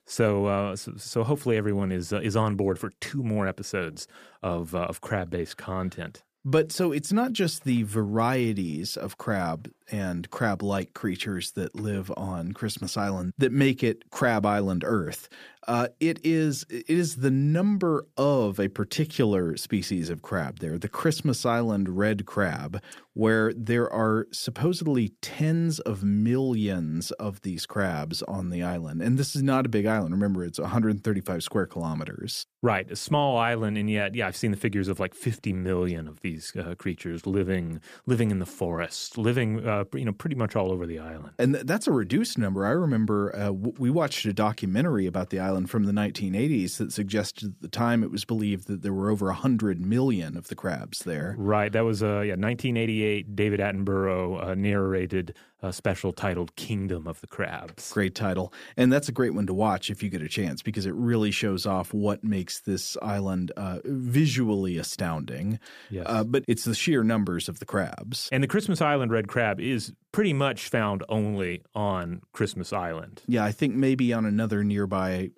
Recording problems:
none

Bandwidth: 15 kHz